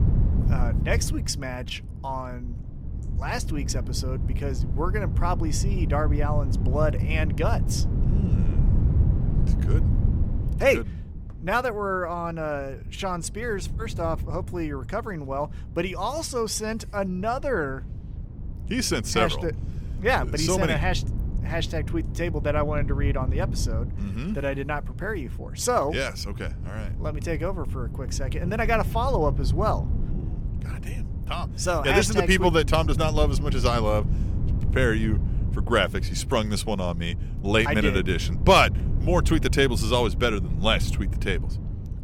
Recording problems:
wind noise on the microphone; occasional gusts; 15 dB below the speech

